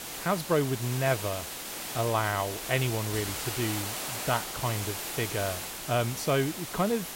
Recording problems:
hiss; loud; throughout; 4 dB below the speech

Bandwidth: 16 kHz